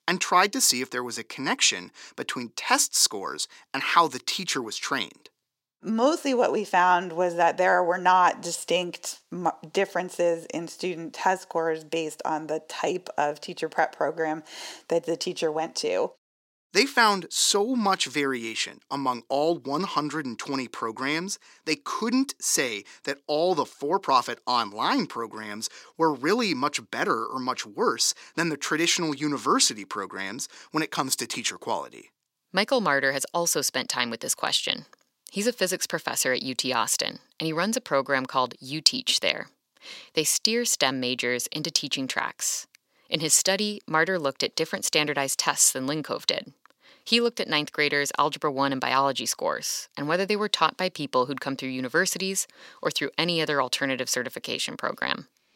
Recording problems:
thin; somewhat; fading below 300 Hz

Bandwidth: 16 kHz